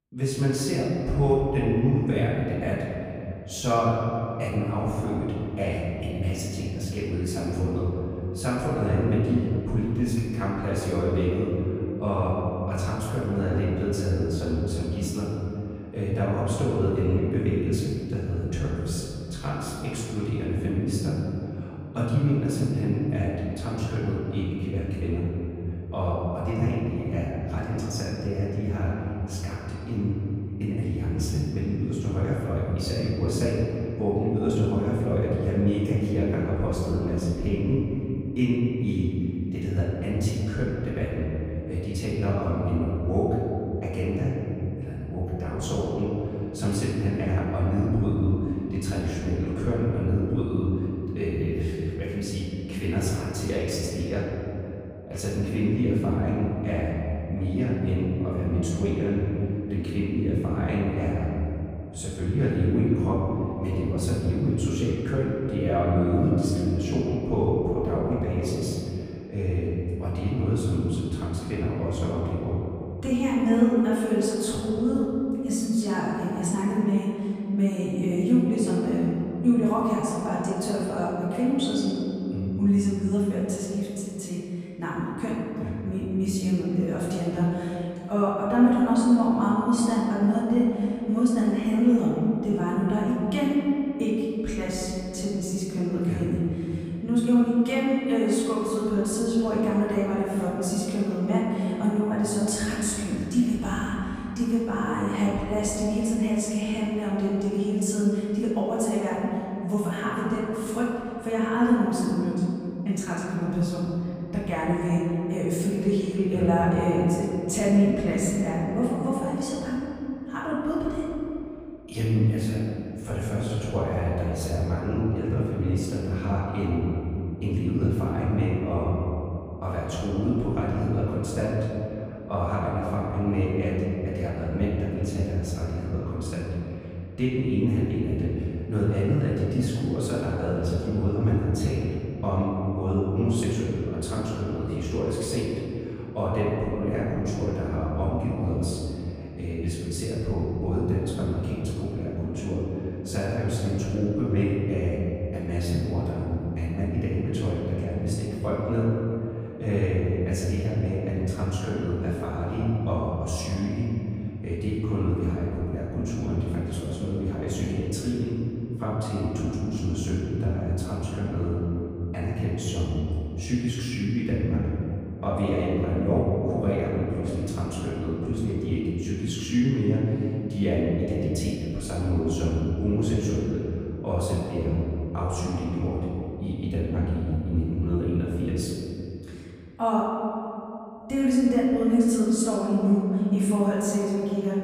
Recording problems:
room echo; strong; dies away in 2.8 s
off-mic speech; far

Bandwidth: 15.5 kHz